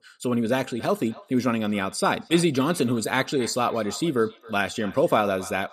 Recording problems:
echo of what is said; faint; throughout; 270 ms later, 20 dB below the speech

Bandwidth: 14.5 kHz